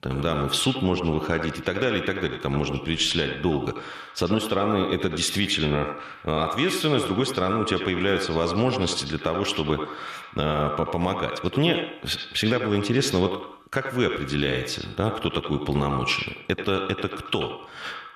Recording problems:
echo of what is said; strong; throughout; 90 ms later, 6 dB below the speech

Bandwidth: 13.5 kHz